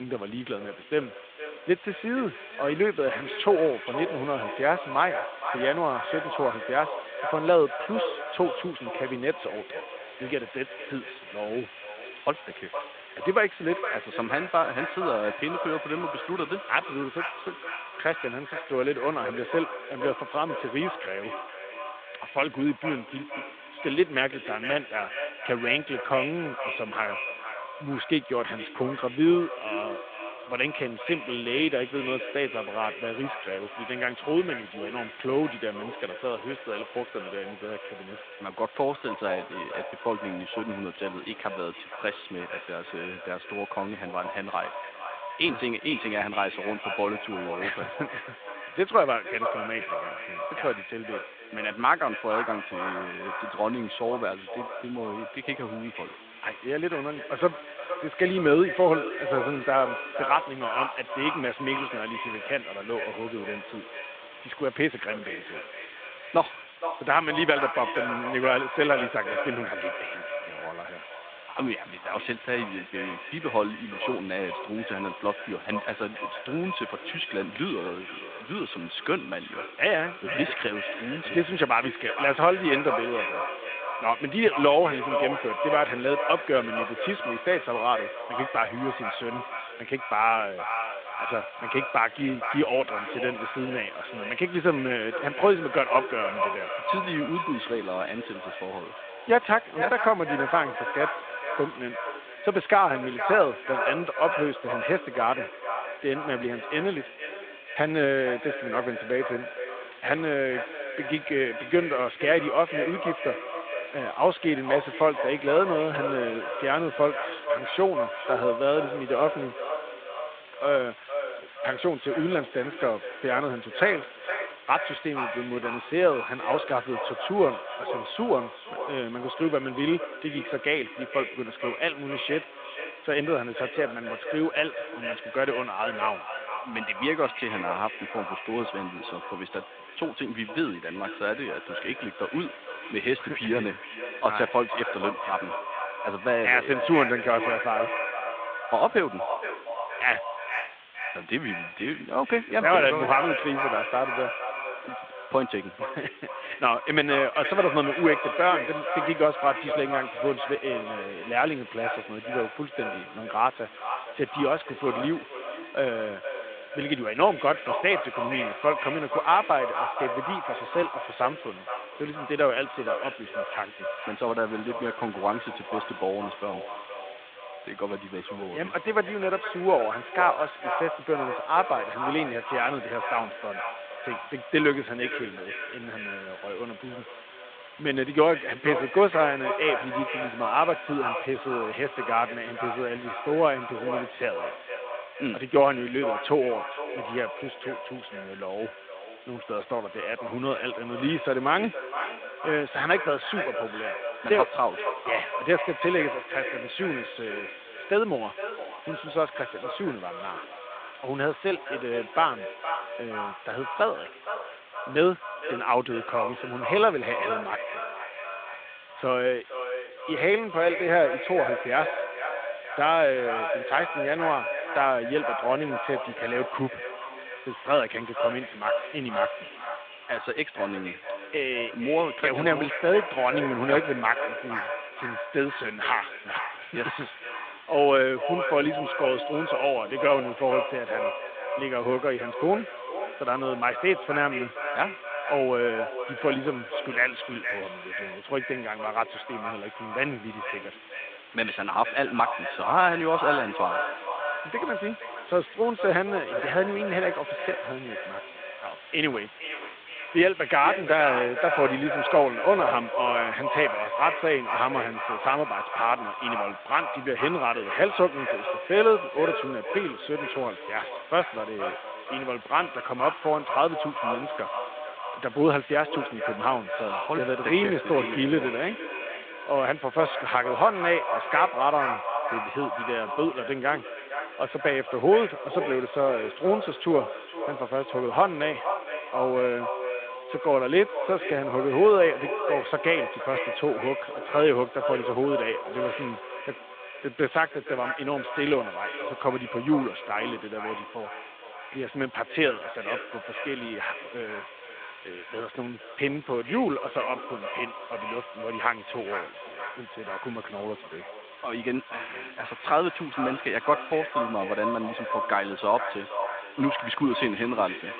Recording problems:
echo of what is said; strong; throughout; 470 ms later, 6 dB below the speech
phone-call audio
hiss; faint; throughout; 20 dB below the speech
abrupt cut into speech; at the start

